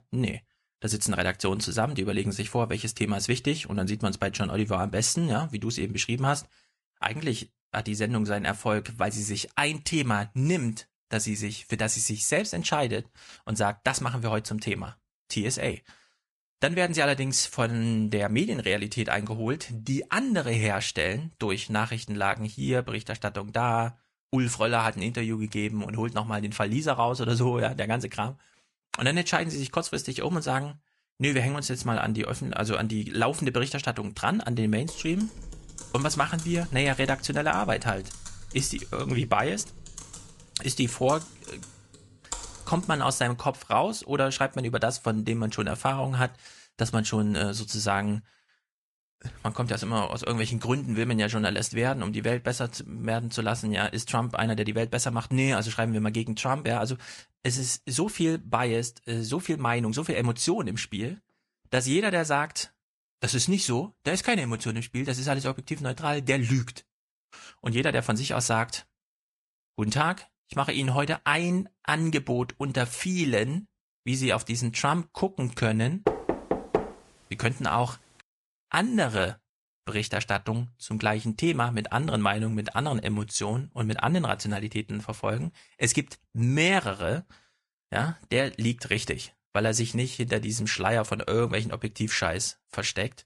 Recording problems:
garbled, watery; slightly; nothing above 10.5 kHz
keyboard typing; noticeable; from 35 to 43 s; peak 9 dB below the speech
door banging; noticeable; at 1:16; peak 1 dB below the speech

